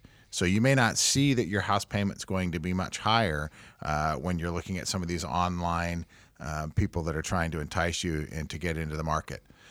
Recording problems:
none

